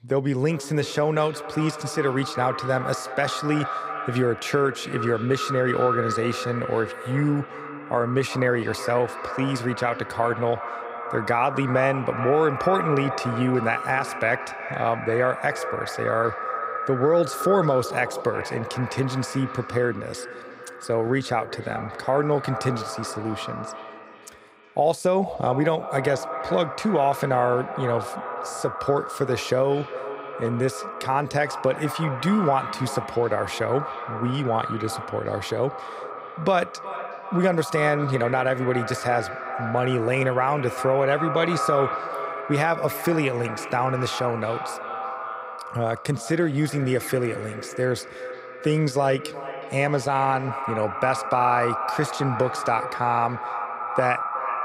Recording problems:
echo of what is said; strong; throughout; 370 ms later, 7 dB below the speech

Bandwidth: 15.5 kHz